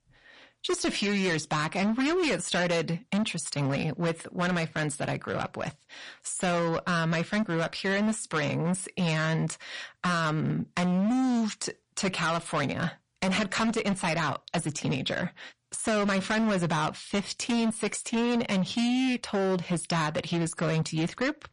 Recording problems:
distortion; heavy; 19% of the sound clipped
garbled, watery; slightly; nothing above 10.5 kHz

